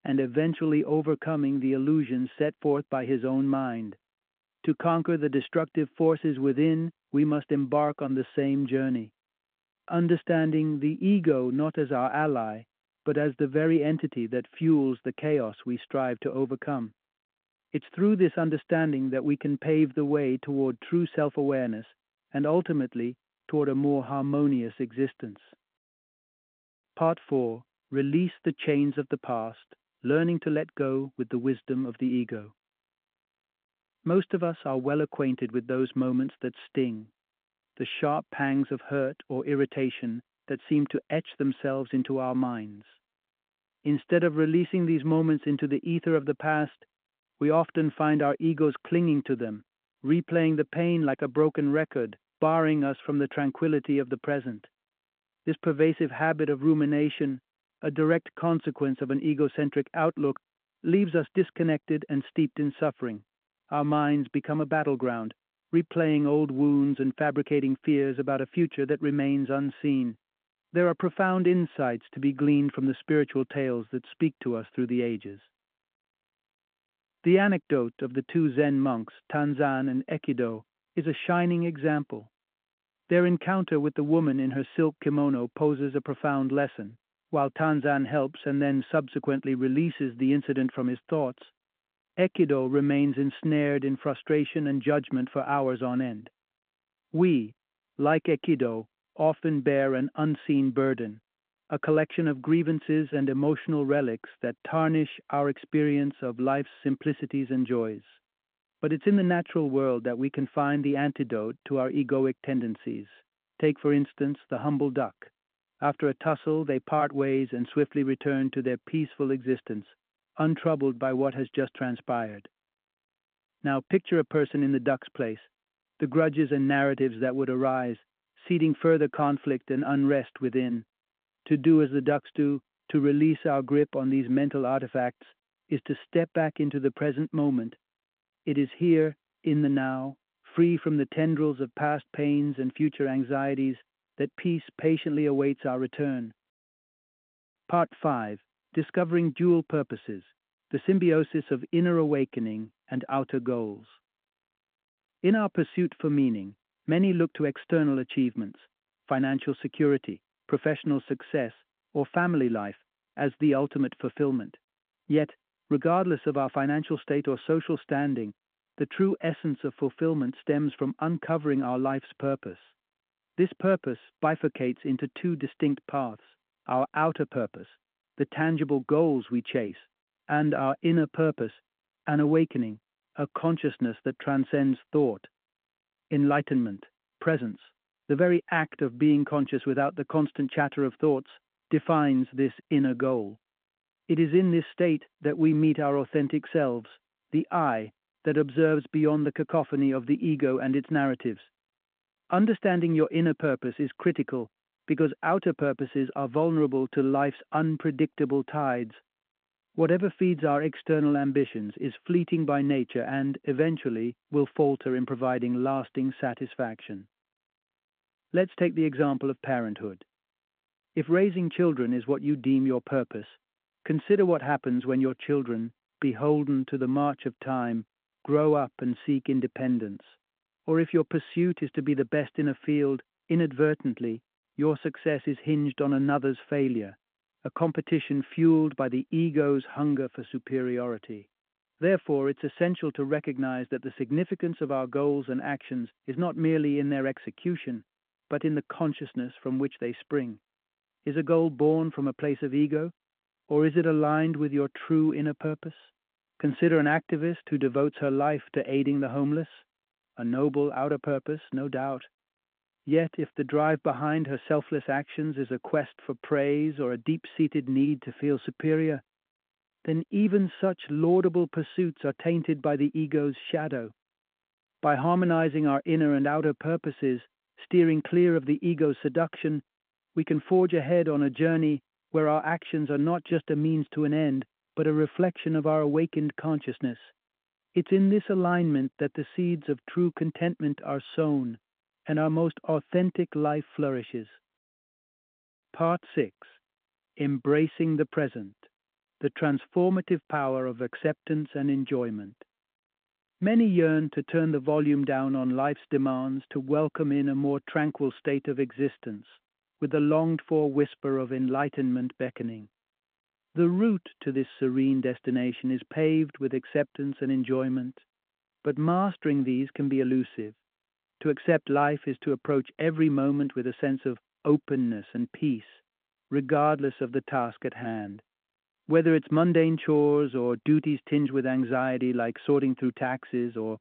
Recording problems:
phone-call audio

